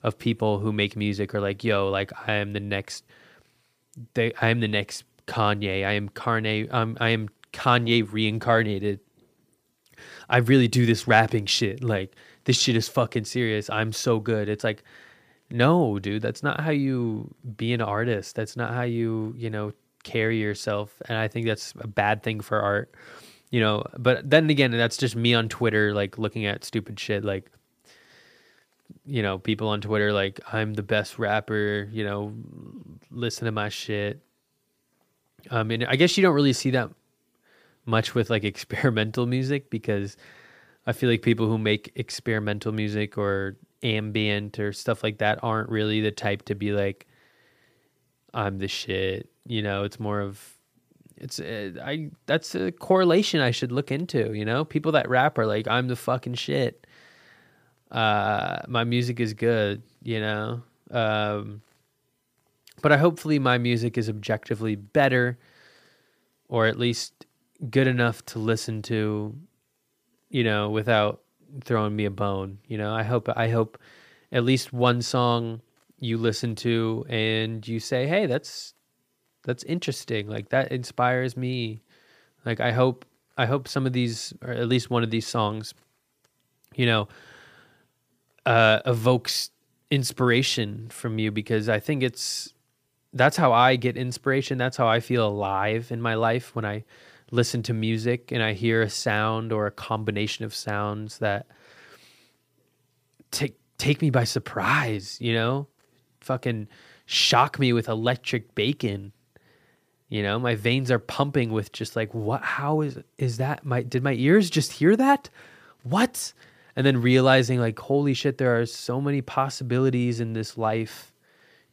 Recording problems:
none

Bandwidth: 15 kHz